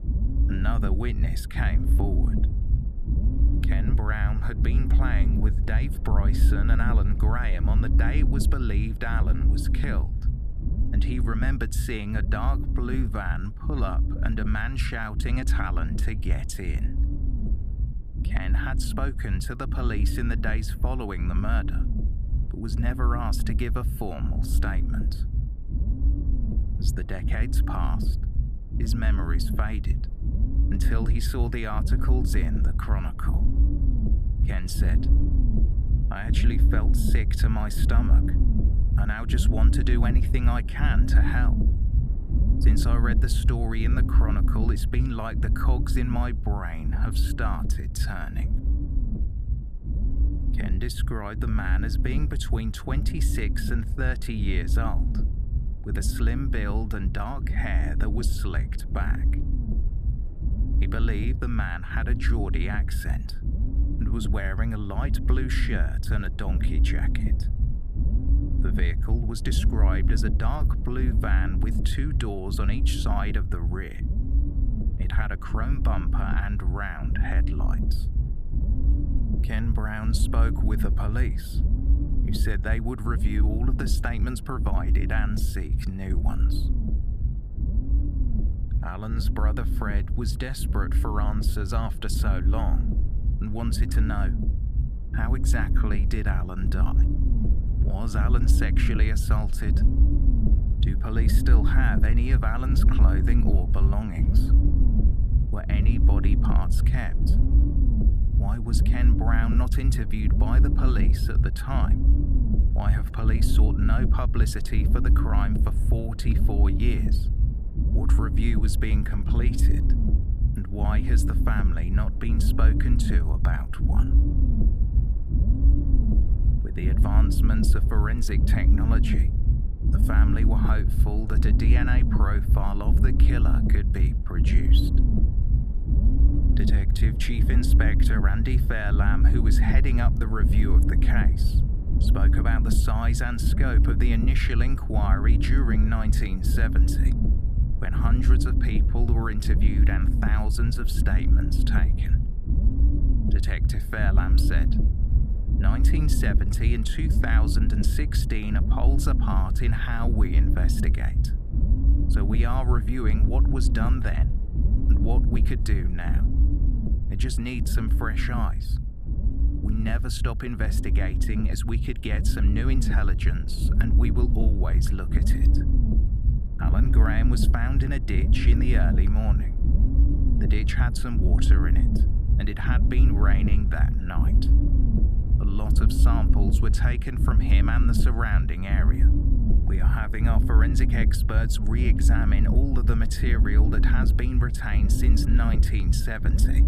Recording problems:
low rumble; loud; throughout; 5 dB below the speech

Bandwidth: 14.5 kHz